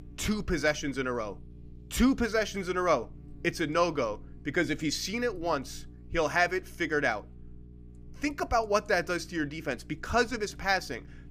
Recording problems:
electrical hum; faint; throughout; 60 Hz, 30 dB below the speech

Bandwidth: 15 kHz